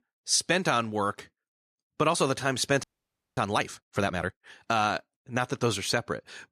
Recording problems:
audio freezing; at 3 s for 0.5 s

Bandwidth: 14.5 kHz